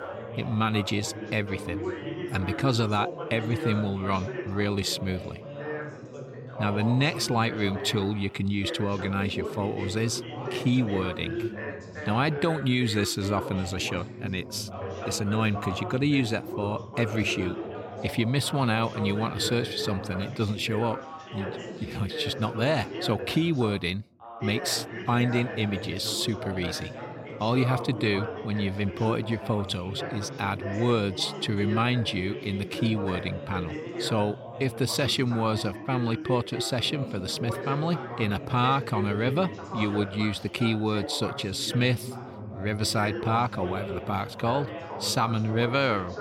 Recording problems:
background chatter; loud; throughout; 3 voices, 8 dB below the speech

